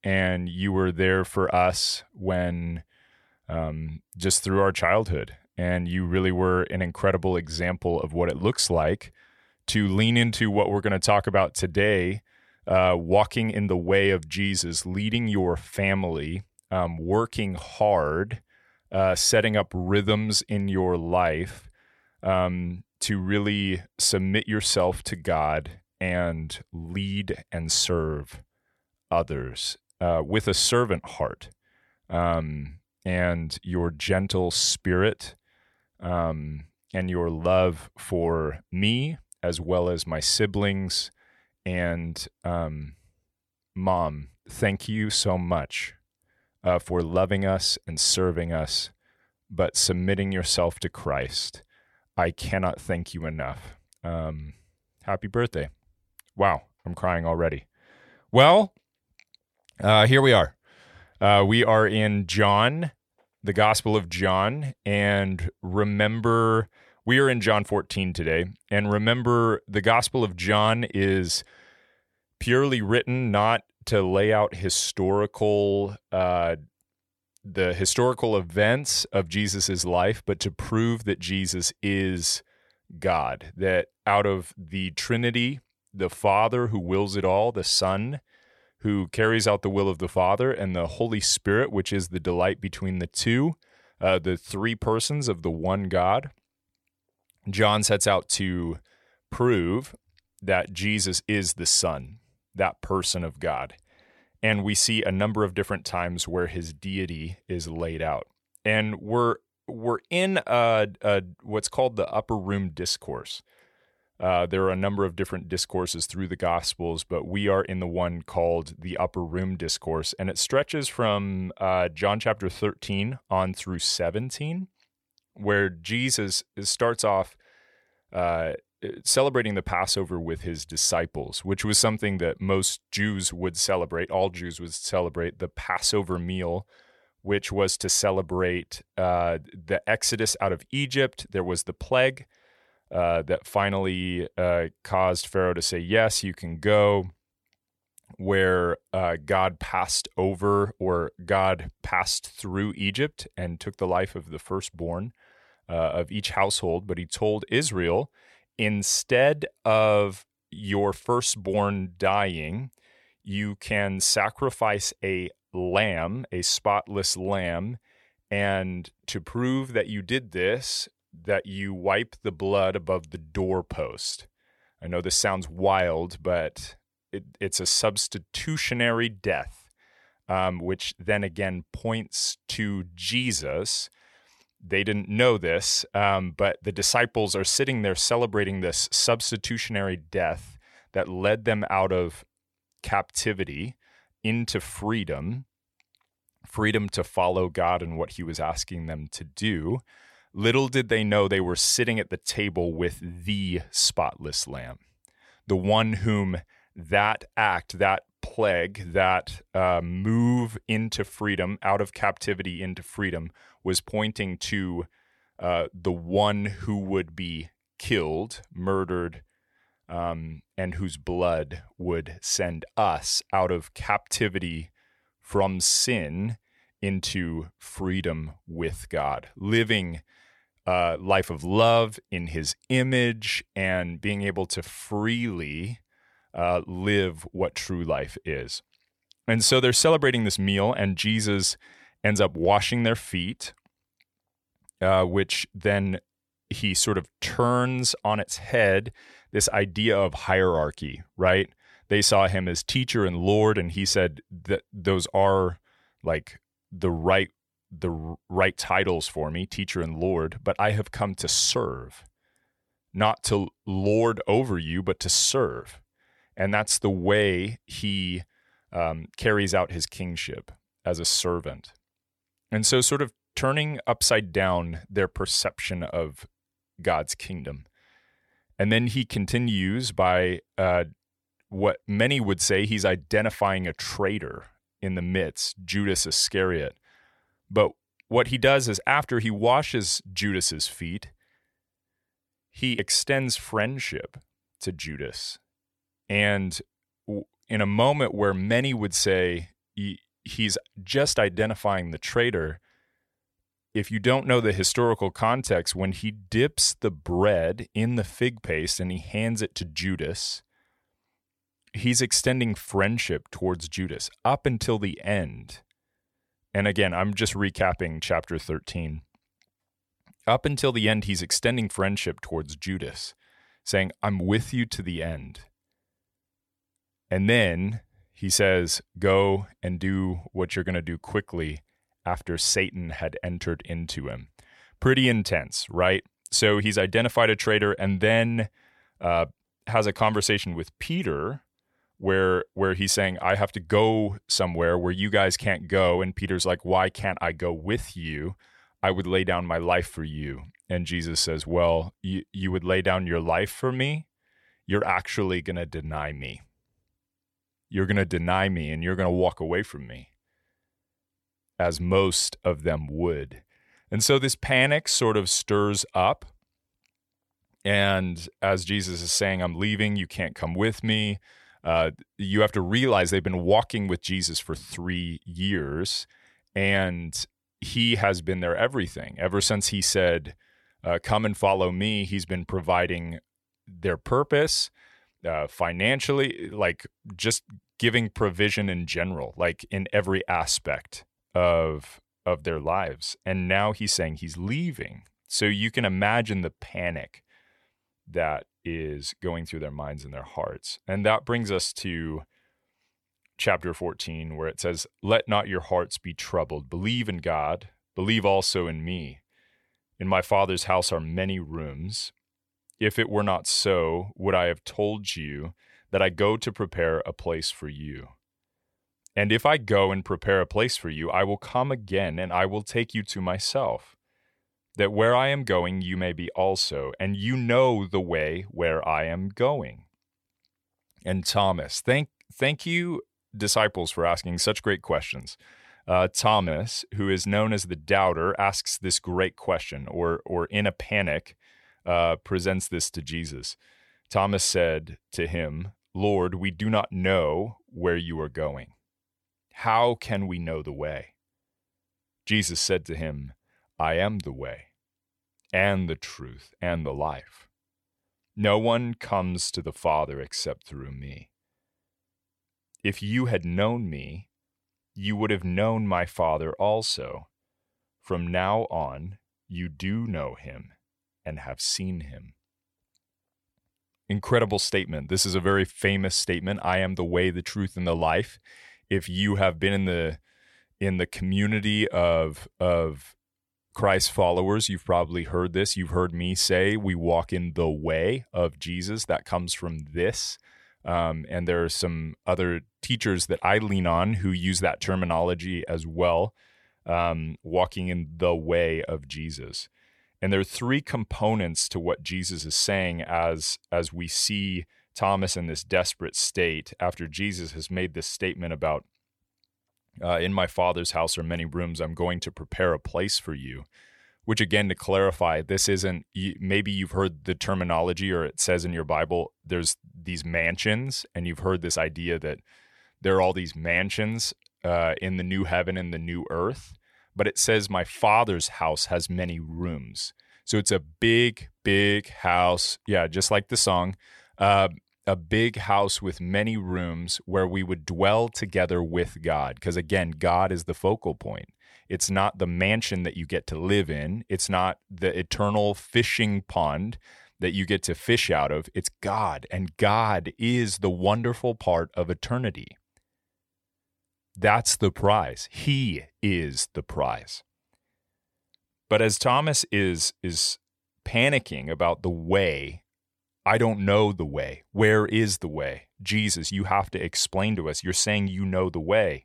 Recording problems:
none

